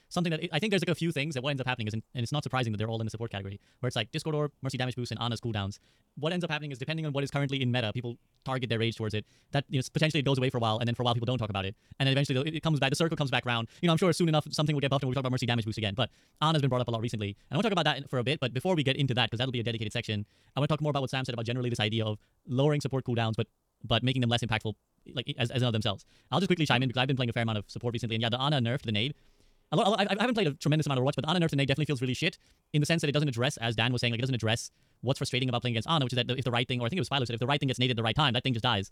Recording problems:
wrong speed, natural pitch; too fast; 1.6 times normal speed

